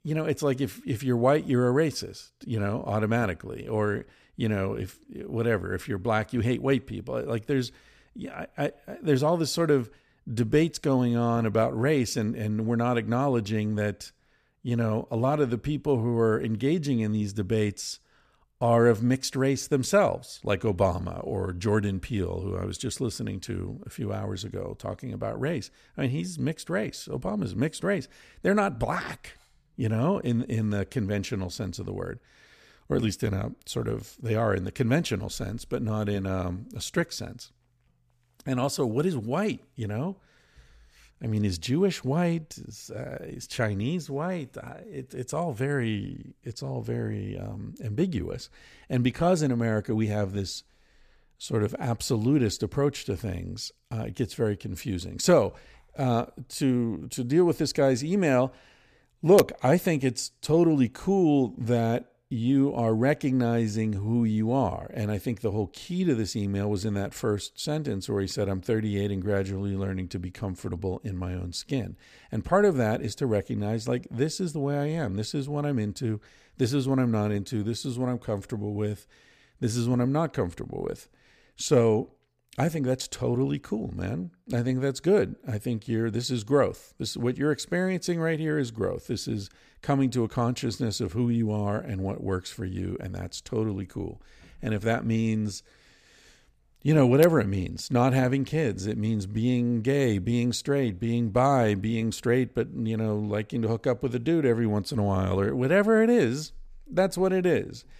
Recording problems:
none

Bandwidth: 14.5 kHz